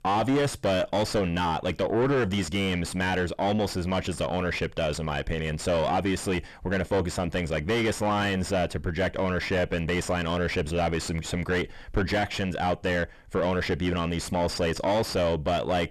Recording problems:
distortion; heavy; 5 dB below the speech

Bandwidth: 13.5 kHz